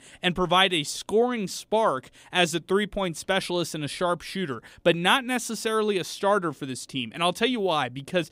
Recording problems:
none

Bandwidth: 15.5 kHz